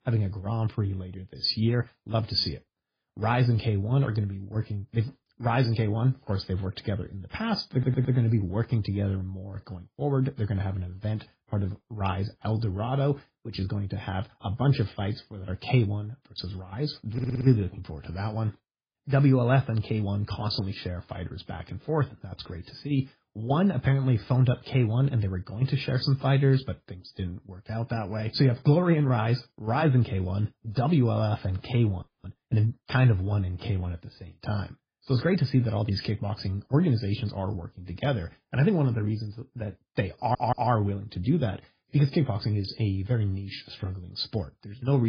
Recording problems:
garbled, watery; badly; nothing above 5 kHz
audio stuttering; at 7.5 s, at 17 s and at 40 s
audio freezing; at 32 s
abrupt cut into speech; at the end

